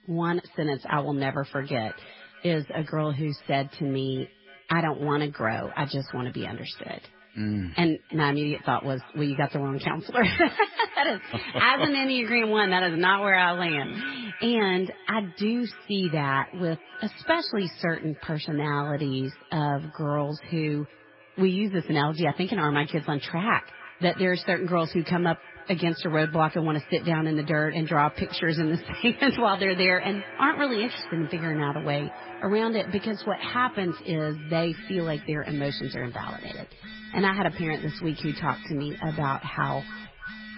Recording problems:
garbled, watery; badly; nothing above 5 kHz
echo of what is said; noticeable; throughout; 310 ms later, 20 dB below the speech
alarms or sirens; noticeable; throughout; 20 dB below the speech

